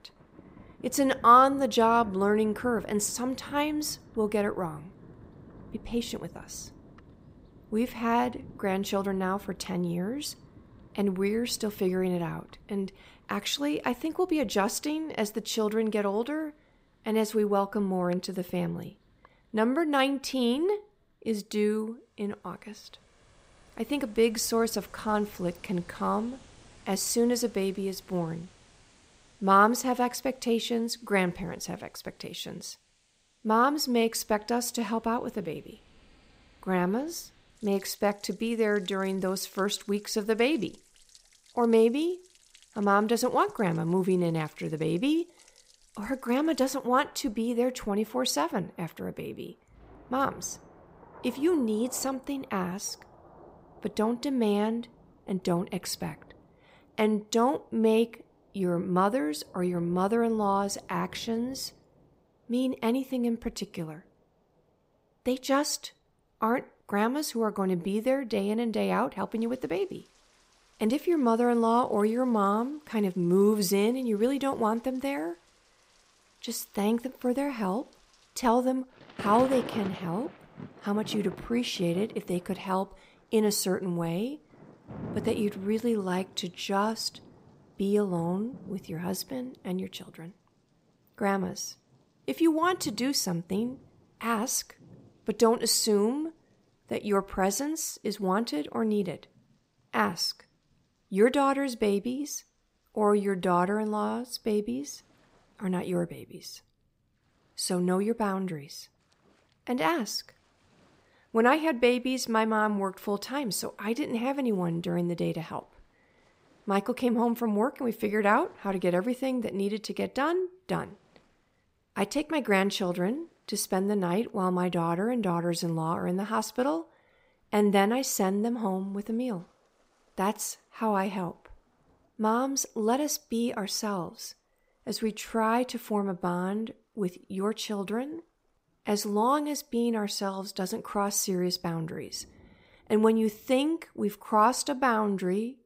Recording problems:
rain or running water; faint; throughout; 25 dB below the speech

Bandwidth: 15.5 kHz